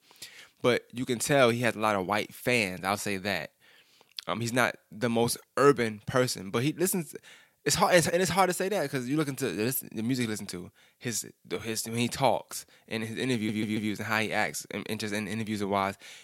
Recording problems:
audio stuttering; at 13 s

